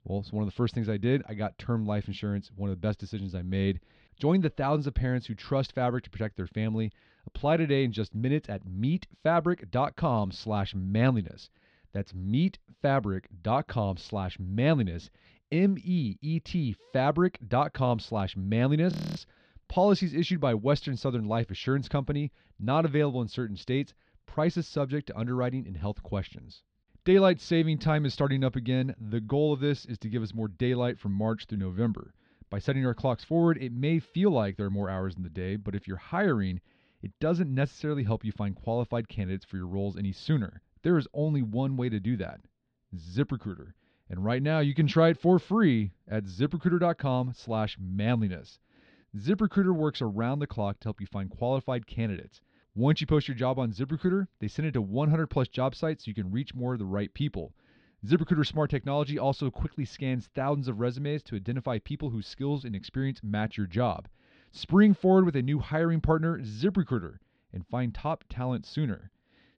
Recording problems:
muffled; very slightly; fading above 4 kHz
audio freezing; at 19 s

